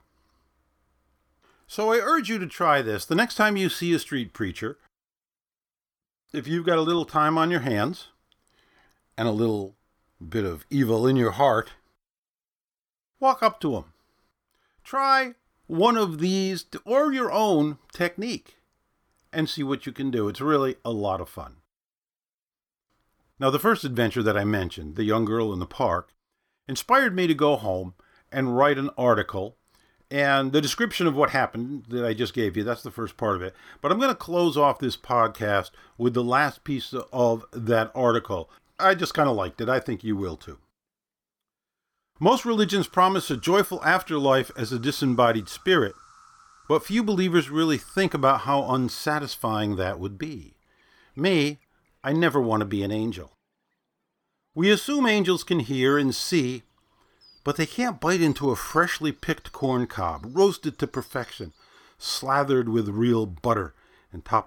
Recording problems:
animal sounds; faint; from 33 s on; 30 dB below the speech

